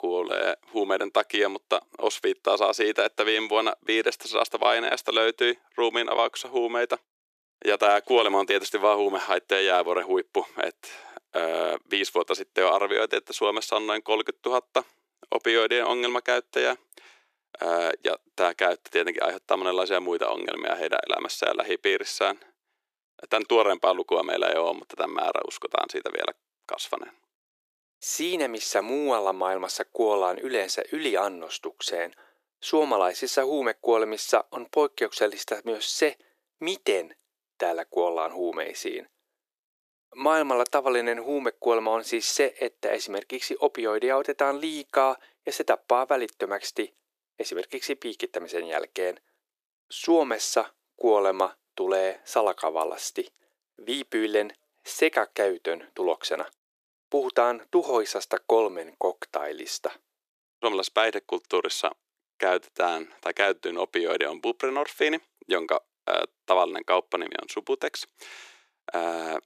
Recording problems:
thin; very; fading below 350 Hz

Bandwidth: 14.5 kHz